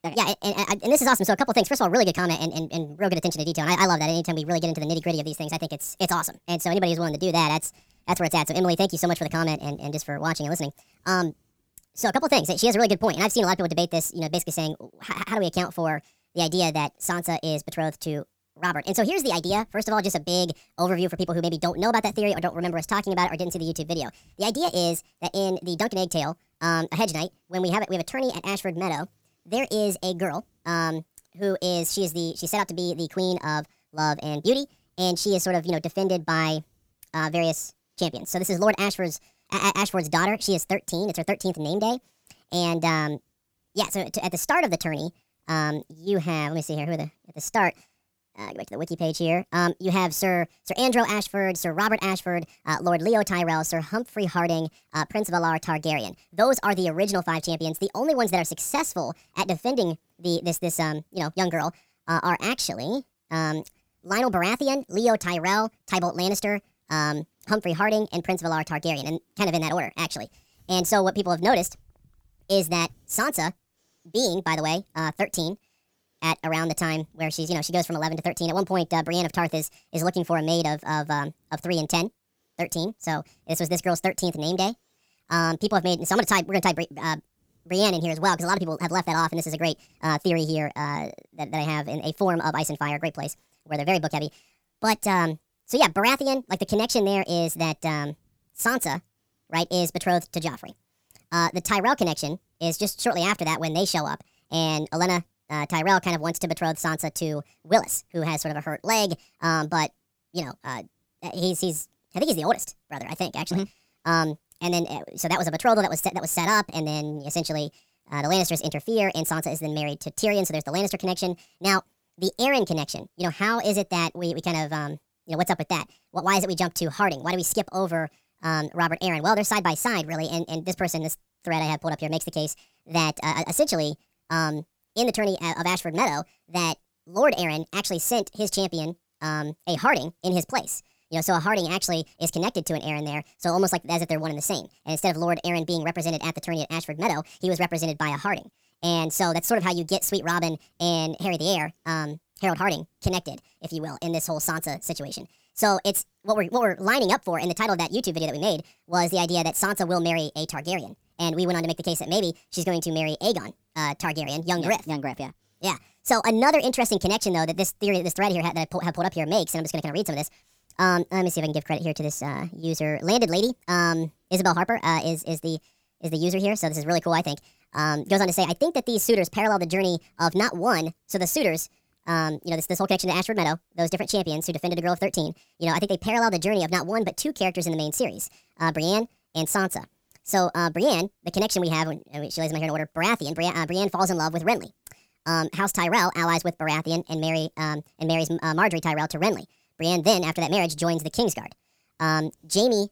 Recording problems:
wrong speed and pitch; too fast and too high; 1.5 times normal speed

